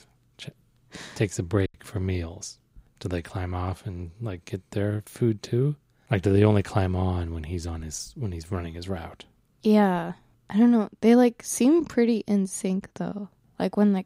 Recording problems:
choppy; very; at 1.5 s; 9% of the speech affected

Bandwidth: 15.5 kHz